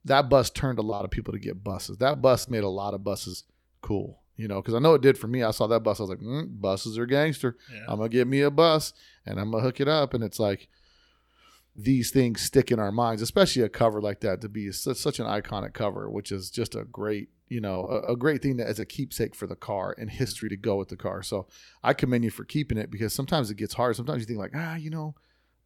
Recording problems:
choppy; very; from 1 to 3.5 s; 5% of the speech affected

